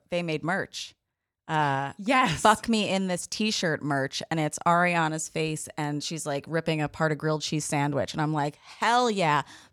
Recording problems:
none

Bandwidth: 18 kHz